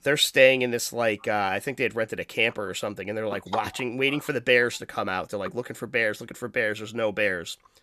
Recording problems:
none

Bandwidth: 14 kHz